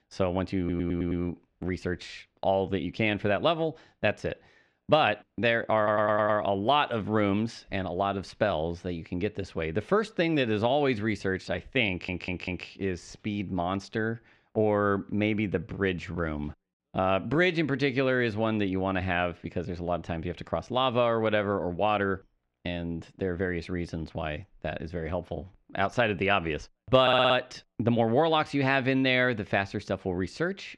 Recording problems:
muffled; slightly; fading above 2.5 kHz
audio stuttering; 4 times, first at 0.5 s

